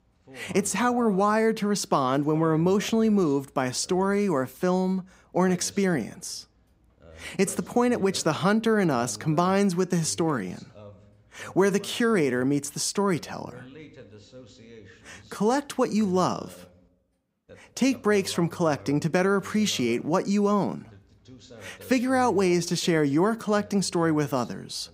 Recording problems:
voice in the background; faint; throughout; 25 dB below the speech

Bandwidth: 15.5 kHz